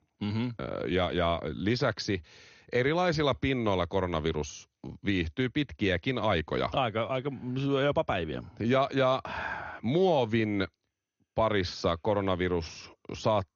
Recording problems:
garbled, watery; slightly; nothing above 6.5 kHz

